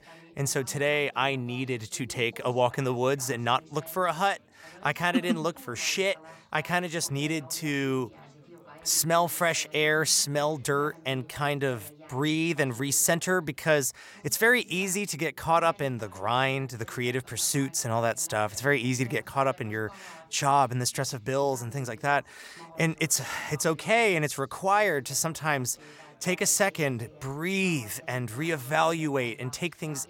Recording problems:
background chatter; faint; throughout; 3 voices, 25 dB below the speech

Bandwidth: 16.5 kHz